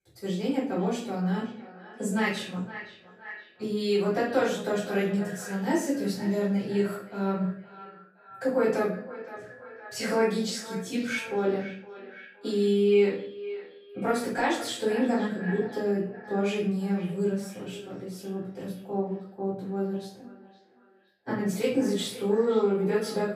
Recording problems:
off-mic speech; far
echo of what is said; noticeable; throughout; 520 ms later, 15 dB below the speech
room echo; noticeable; dies away in 0.5 s

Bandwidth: 15 kHz